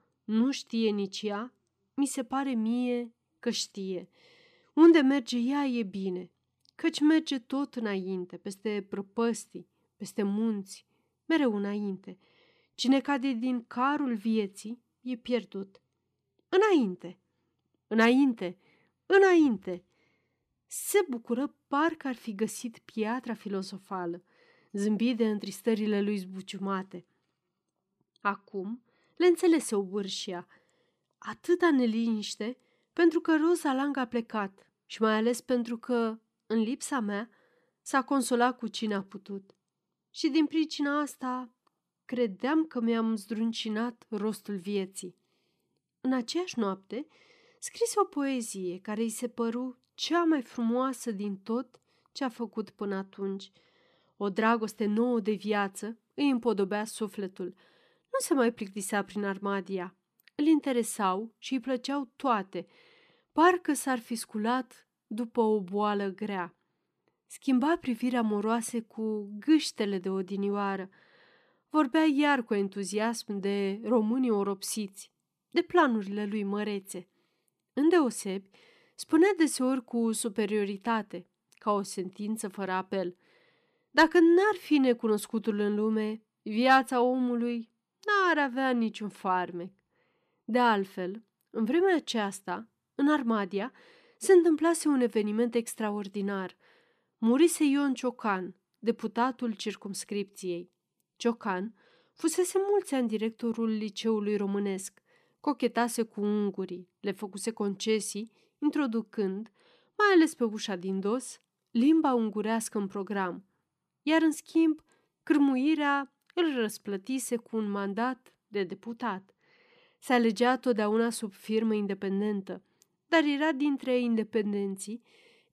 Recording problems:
none

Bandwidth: 14.5 kHz